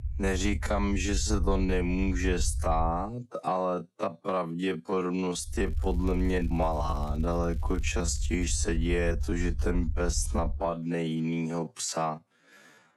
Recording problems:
wrong speed, natural pitch; too slow; 0.5 times normal speed
low rumble; faint; until 3 s and from 5.5 to 11 s; 20 dB below the speech
crackling; faint; from 5.5 to 8.5 s; 30 dB below the speech

